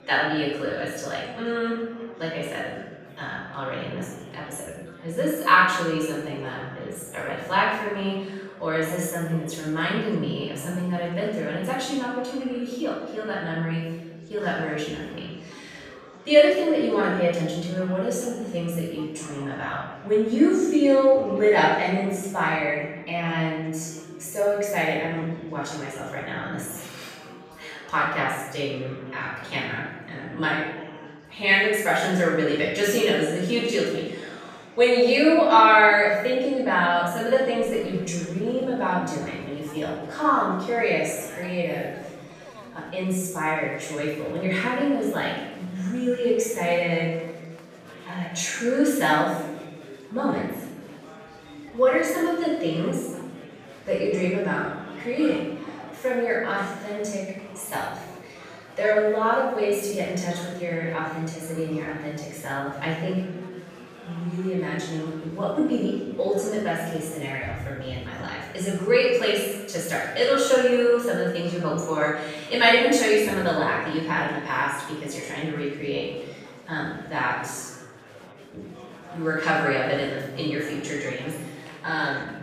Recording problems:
off-mic speech; far
room echo; noticeable; dies away in 0.9 s
chatter from many people; faint; throughout; 20 dB below the speech

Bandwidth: 14.5 kHz